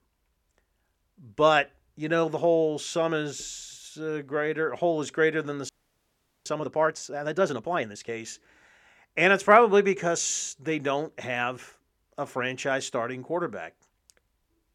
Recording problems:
audio freezing; at 5.5 s for 1 s

